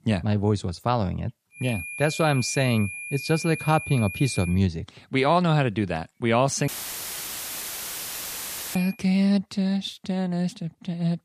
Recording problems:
high-pitched whine; loud; from 1.5 to 4.5 s and from 6.5 to 9 s; 2.5 kHz, 9 dB below the speech
audio cutting out; filled with static; at 6.5 s for 2 s

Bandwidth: 14.5 kHz